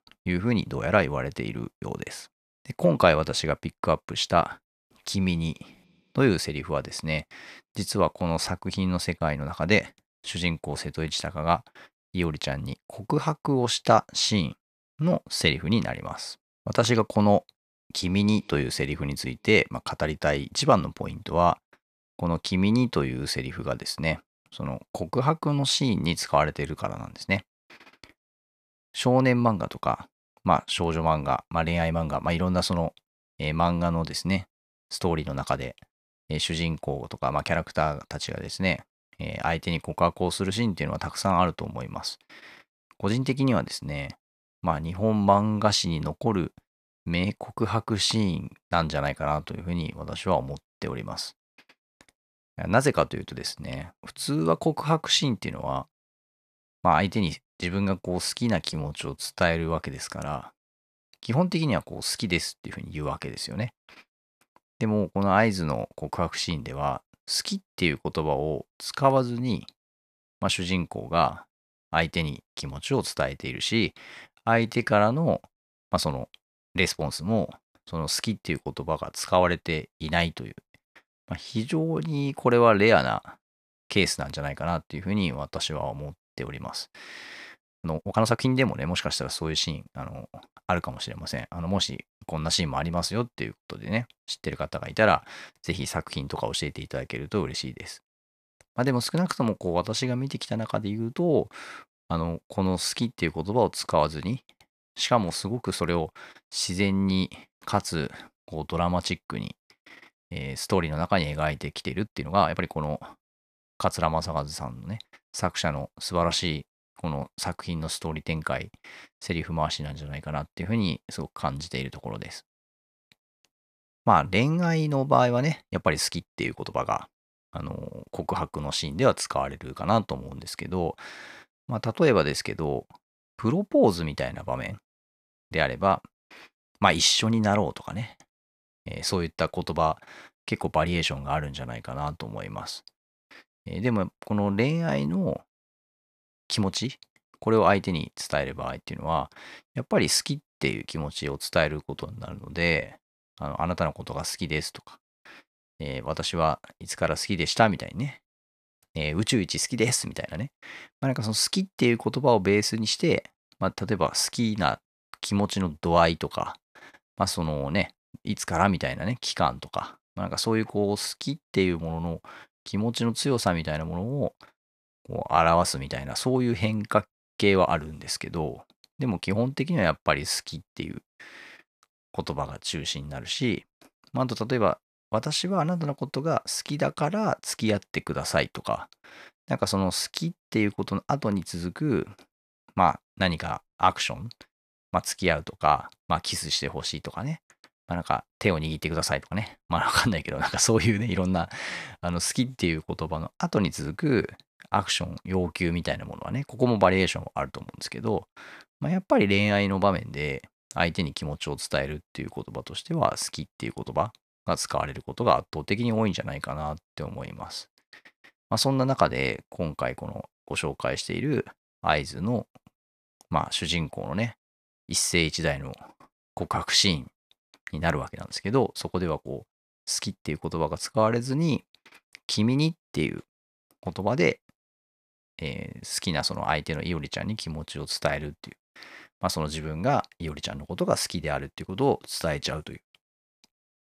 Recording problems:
uneven, jittery; strongly; from 32 s to 3:52

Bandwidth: 14.5 kHz